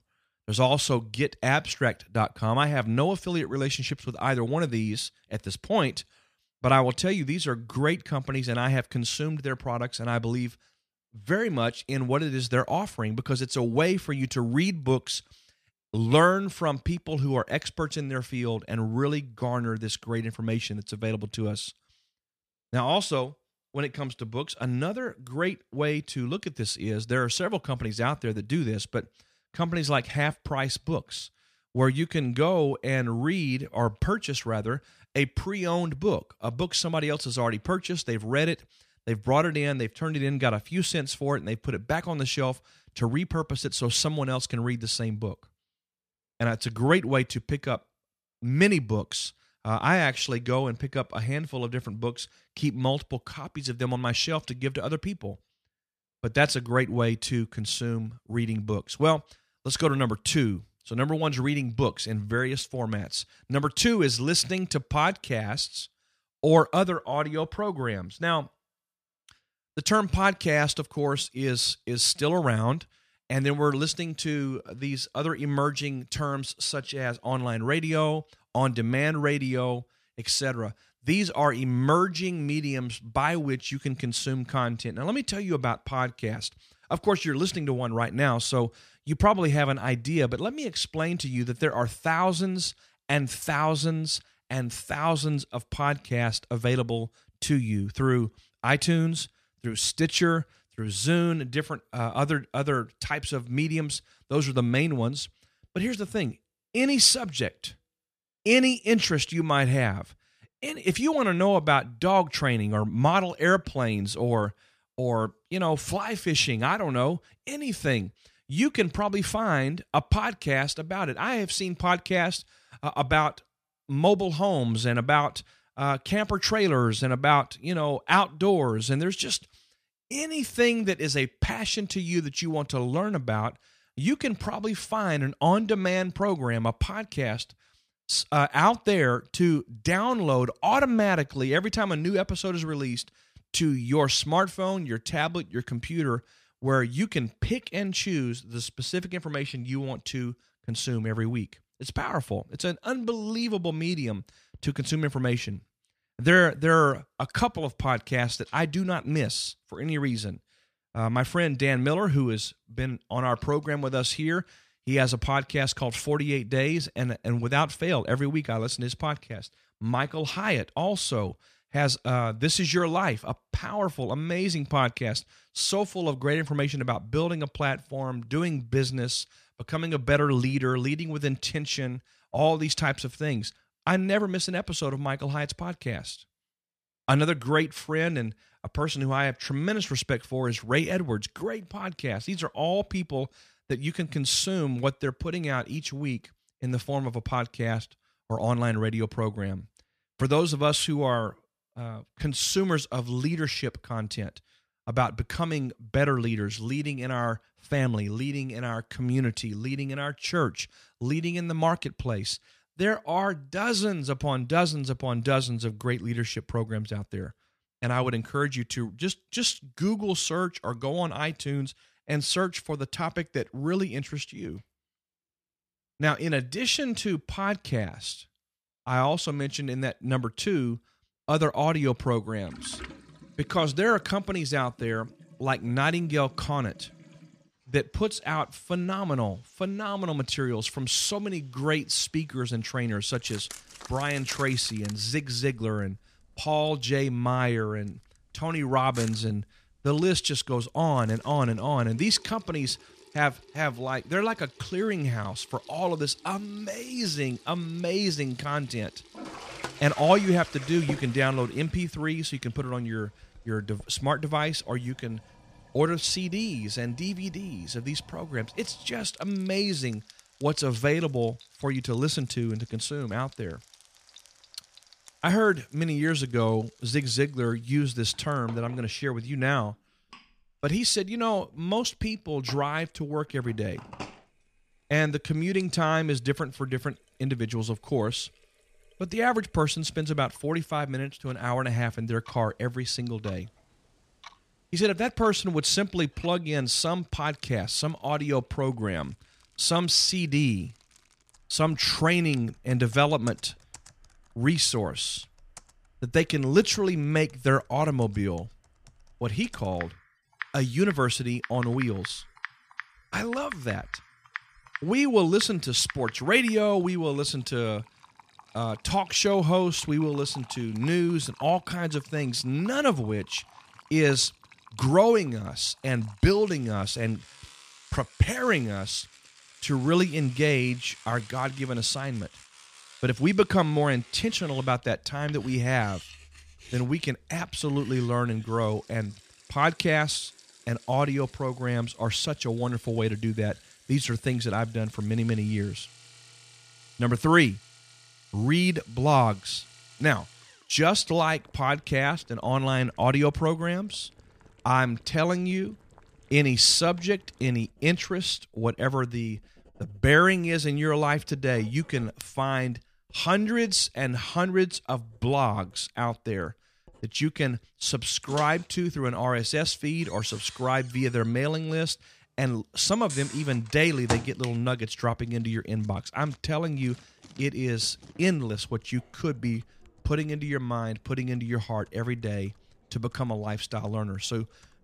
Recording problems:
household noises; noticeable; from 3:53 on; 20 dB below the speech

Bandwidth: 14.5 kHz